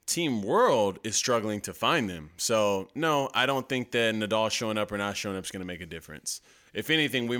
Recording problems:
abrupt cut into speech; at the end

